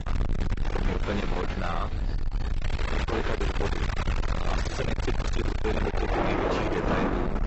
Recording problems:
distortion; heavy; 8 dB below the speech
garbled, watery; badly; nothing above 7.5 kHz
rain or running water; very loud; throughout; 1 dB above the speech
wind noise on the microphone; heavy; 1 dB below the speech
voice in the background; faint; throughout; 20 dB below the speech

